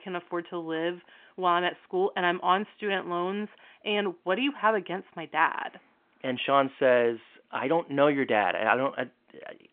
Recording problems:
phone-call audio; nothing above 3.5 kHz

